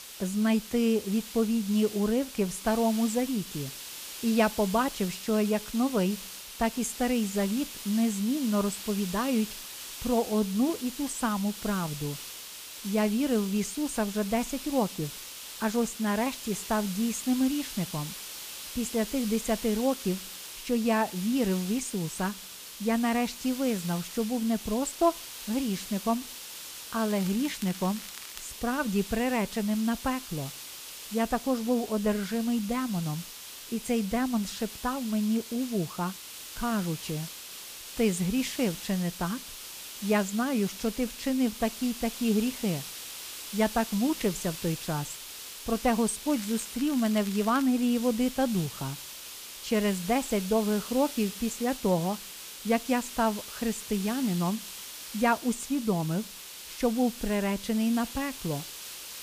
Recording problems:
hiss; loud; throughout; 10 dB below the speech
crackling; noticeable; from 27 to 28 s and from 46 to 48 s; 15 dB below the speech

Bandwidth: 15 kHz